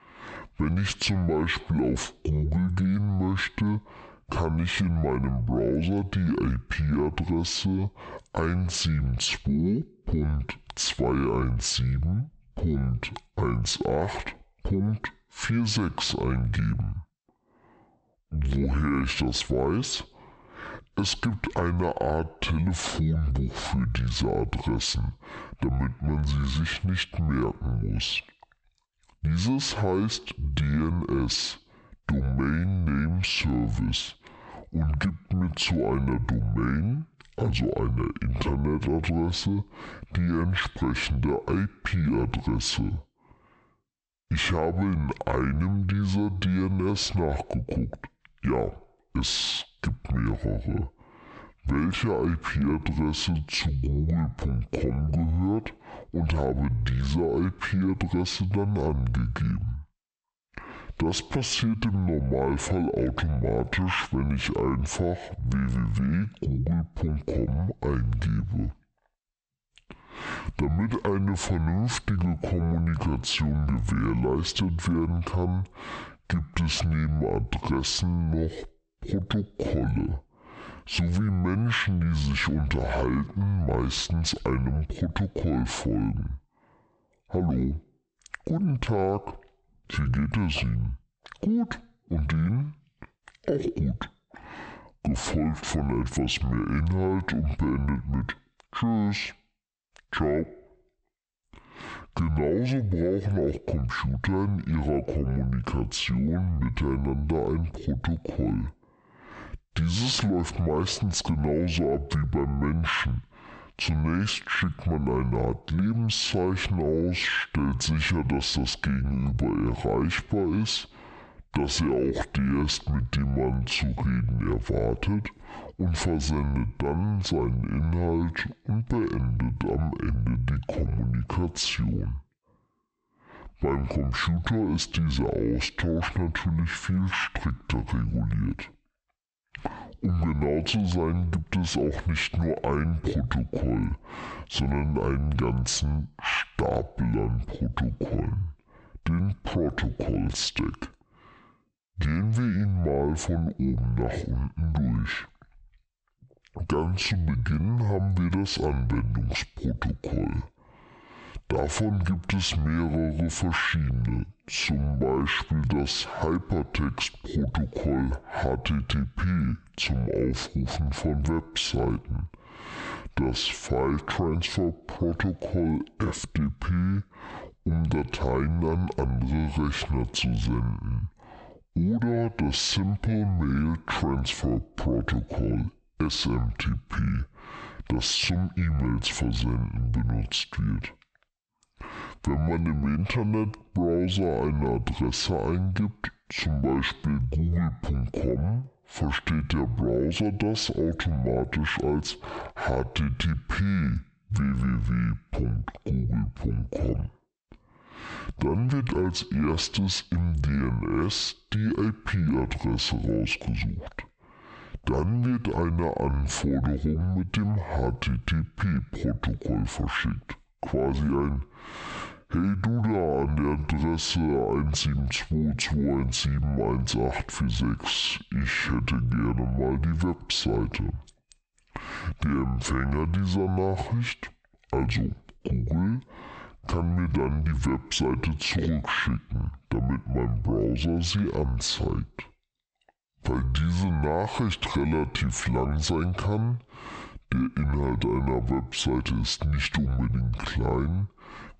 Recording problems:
squashed, flat; heavily
wrong speed and pitch; too slow and too low; 0.6 times normal speed

